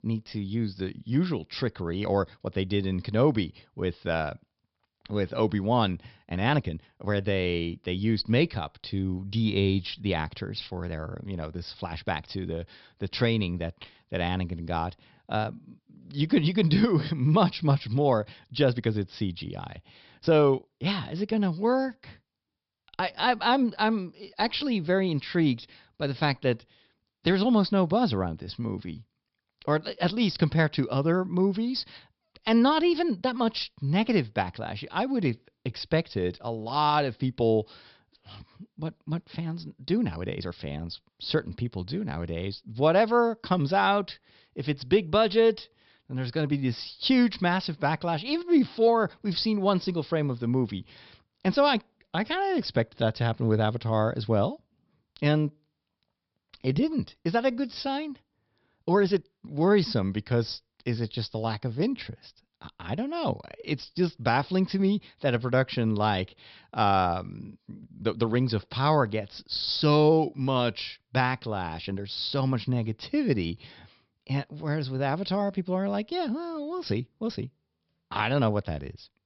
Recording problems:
high frequencies cut off; noticeable; nothing above 5.5 kHz
uneven, jittery; strongly; from 2 s to 1:12

